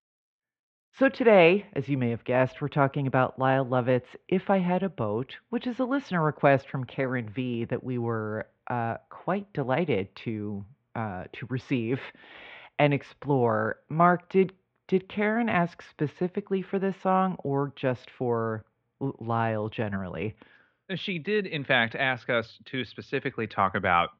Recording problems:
muffled; very; fading above 3.5 kHz

